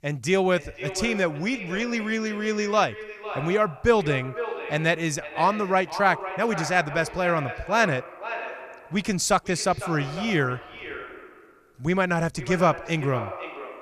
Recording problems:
echo of what is said; strong; throughout; 500 ms later, 10 dB below the speech

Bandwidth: 14.5 kHz